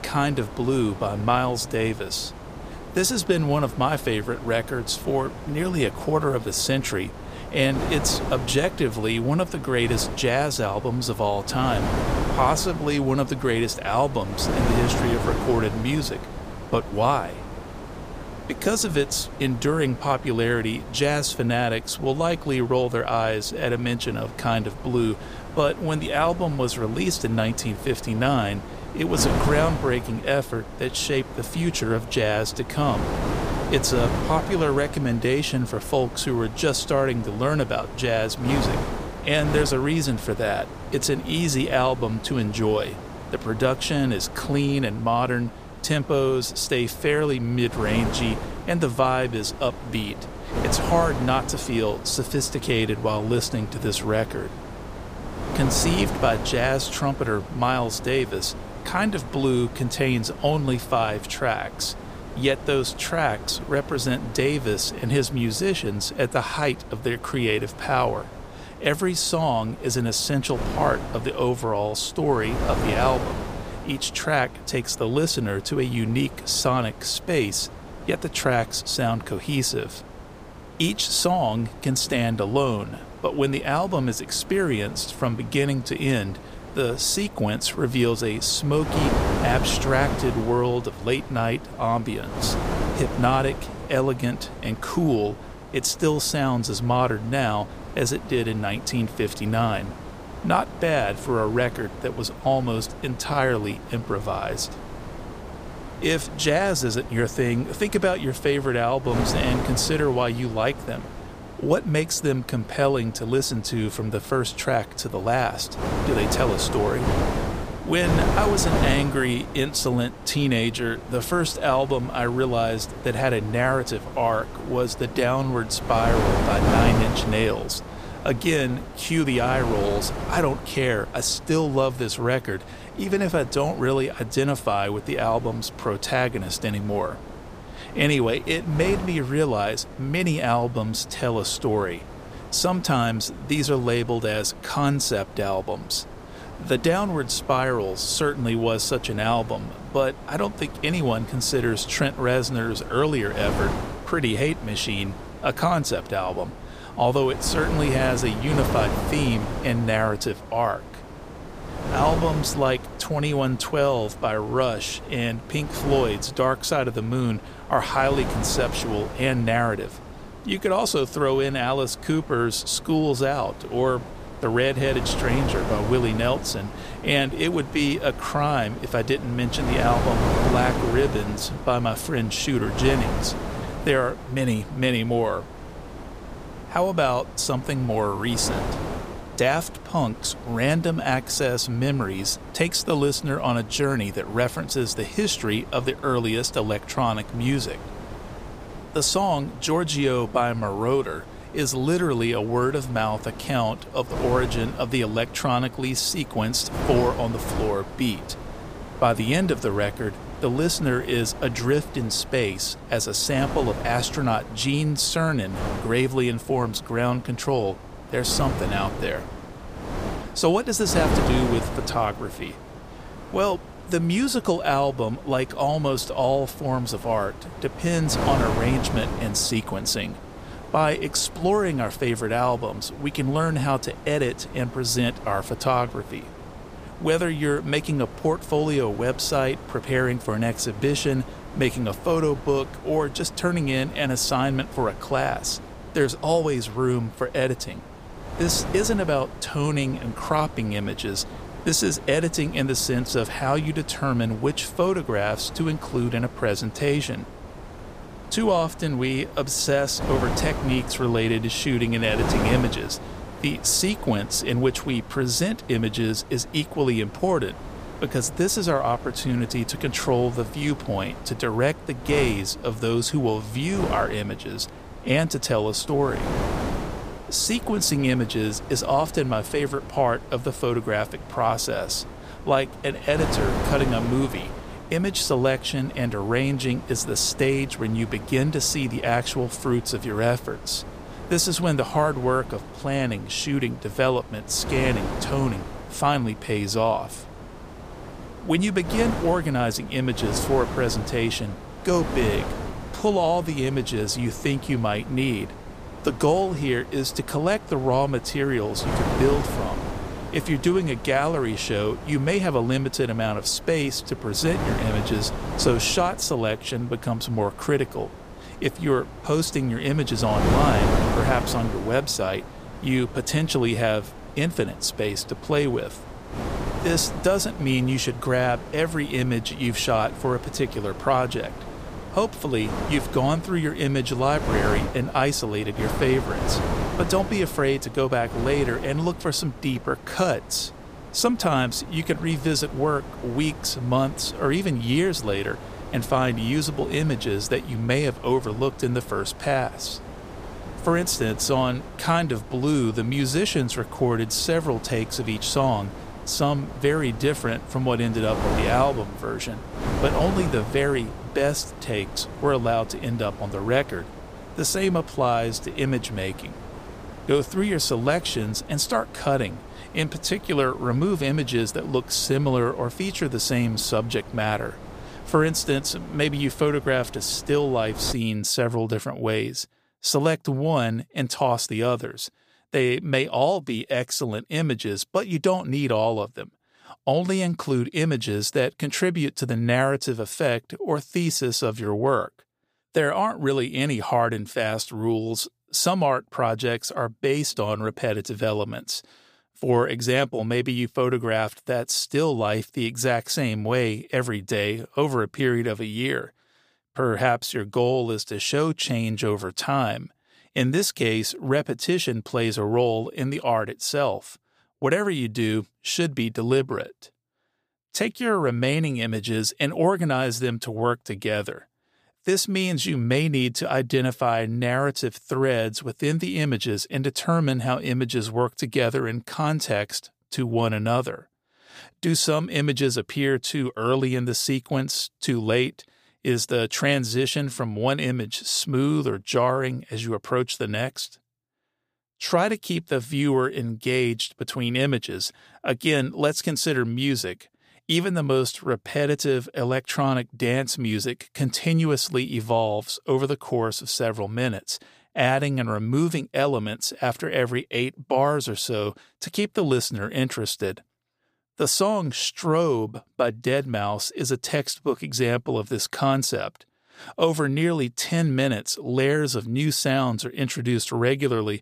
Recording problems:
wind noise on the microphone; occasional gusts; until 6:18; 10 dB below the speech

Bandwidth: 15 kHz